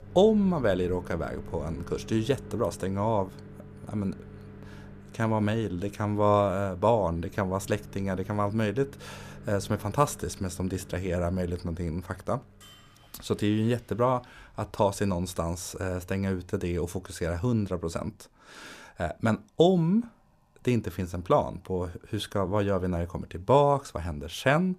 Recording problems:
household noises; noticeable; throughout; 20 dB below the speech

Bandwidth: 14.5 kHz